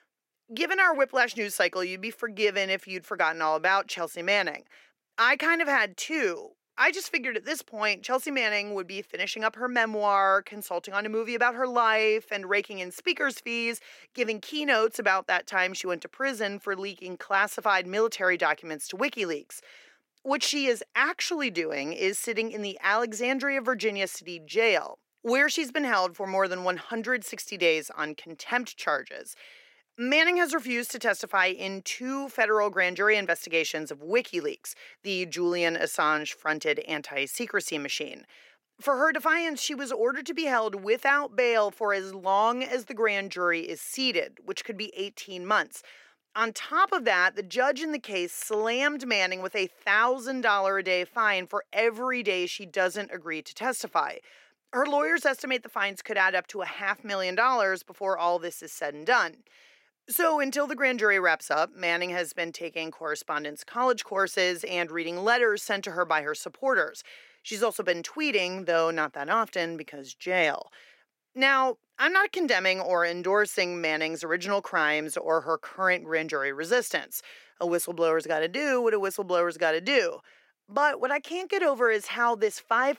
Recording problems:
thin; somewhat; fading below 450 Hz

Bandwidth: 16.5 kHz